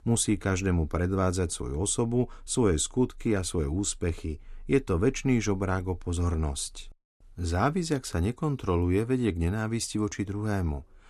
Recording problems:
none

